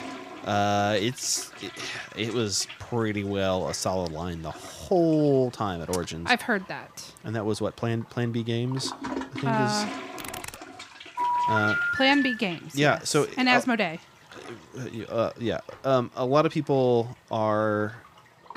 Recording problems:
household noises; noticeable; throughout; 15 dB below the speech
keyboard typing; faint; at 10 s; peak 10 dB below the speech
phone ringing; loud; from 11 to 12 s; peak 2 dB above the speech

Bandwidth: 15 kHz